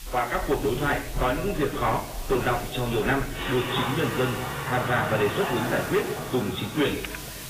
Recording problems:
garbled, watery; badly; nothing above 4 kHz
room echo; slight; dies away in 0.6 s
distortion; slight; 6% of the sound clipped
off-mic speech; somewhat distant
household noises; loud; throughout; 7 dB below the speech
hiss; noticeable; throughout; 15 dB below the speech
alarm; noticeable; at 5.5 s; peak 7 dB below the speech
keyboard typing; faint; at 7 s; peak 10 dB below the speech

